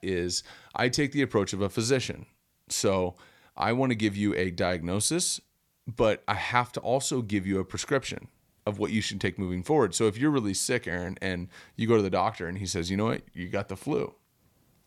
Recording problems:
none

